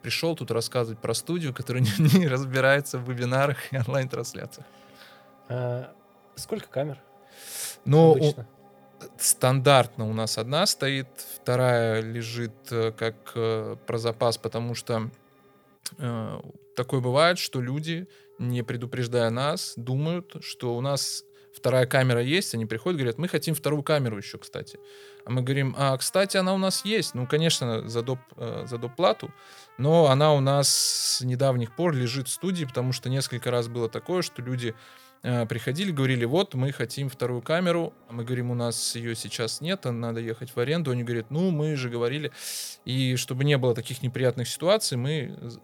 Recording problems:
background music; faint; throughout; 30 dB below the speech

